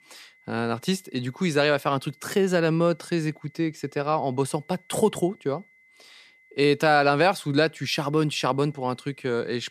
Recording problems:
high-pitched whine; faint; throughout; 2 kHz, 30 dB below the speech

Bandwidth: 14.5 kHz